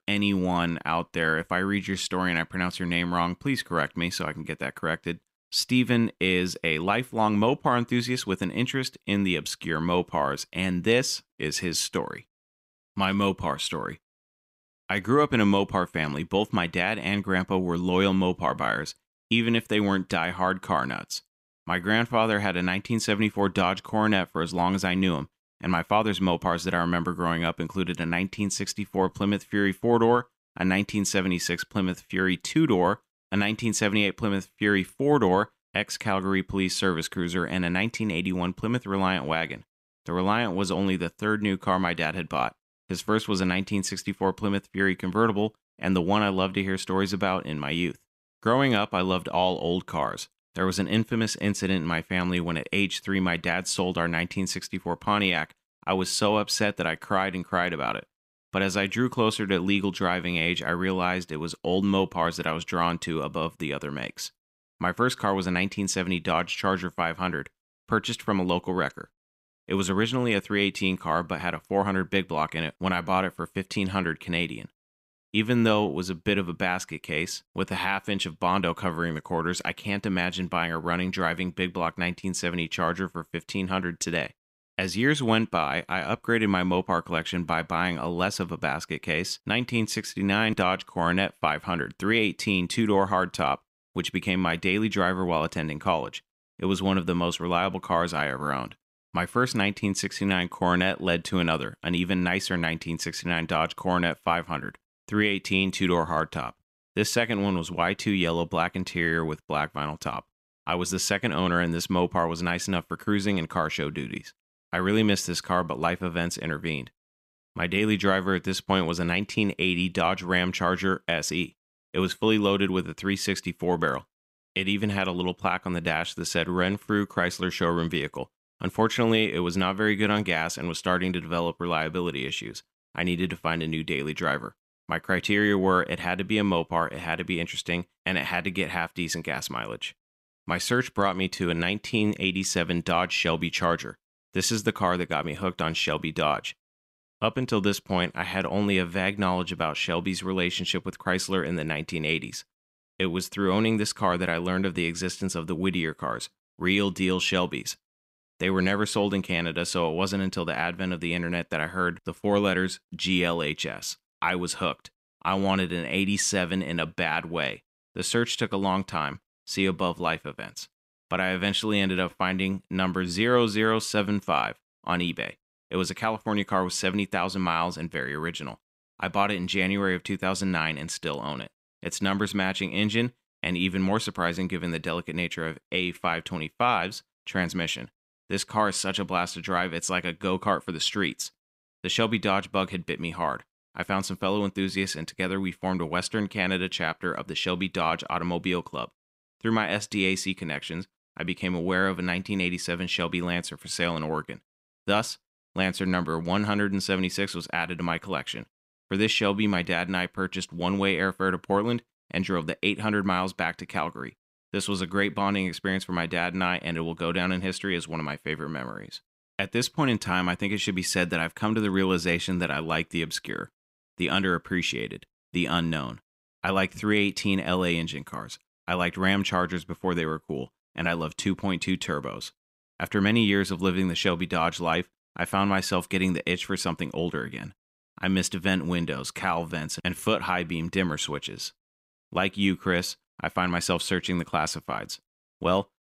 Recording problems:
none

